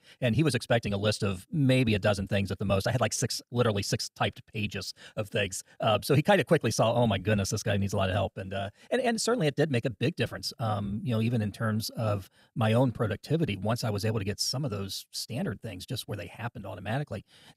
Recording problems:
wrong speed, natural pitch; too fast; 1.5 times normal speed

